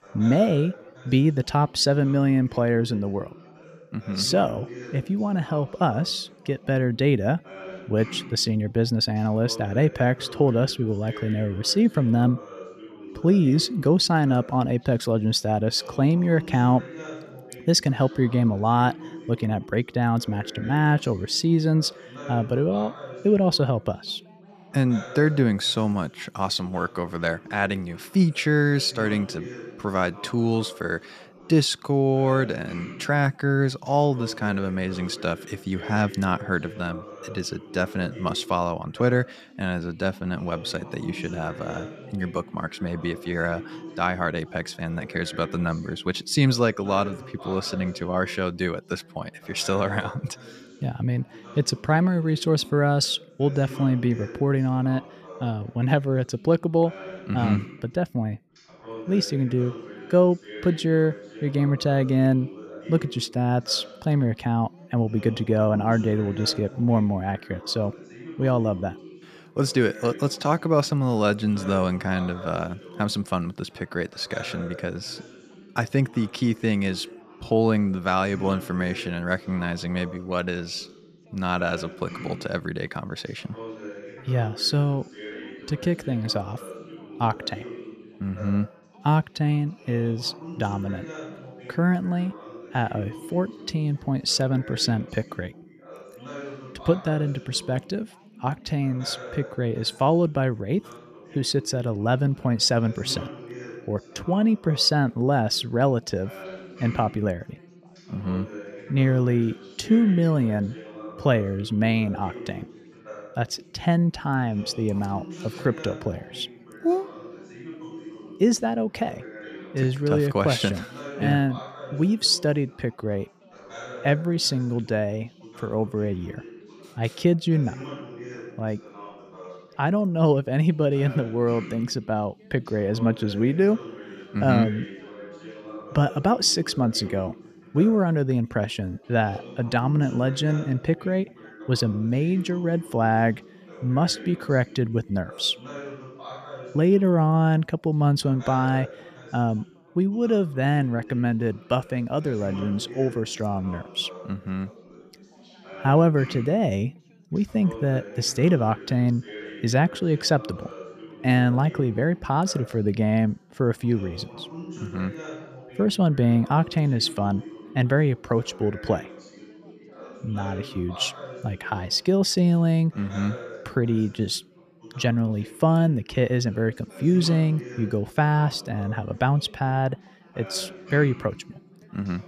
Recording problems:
background chatter; noticeable; throughout; 3 voices, 15 dB below the speech

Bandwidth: 14.5 kHz